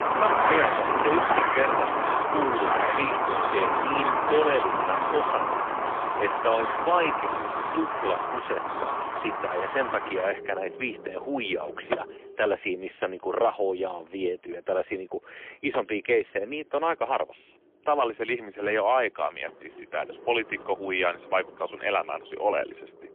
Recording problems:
phone-call audio; poor line; nothing above 3 kHz
traffic noise; very loud; throughout; 2 dB above the speech

